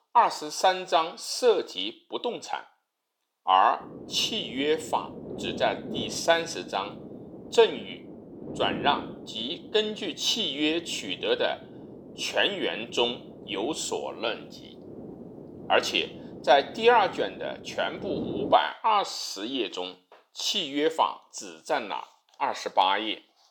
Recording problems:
thin; somewhat; fading below 500 Hz
wind noise on the microphone; occasional gusts; from 4 to 19 s; 20 dB below the speech

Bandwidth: 18 kHz